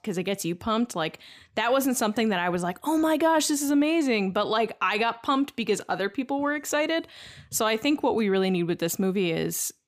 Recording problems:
none

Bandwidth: 15 kHz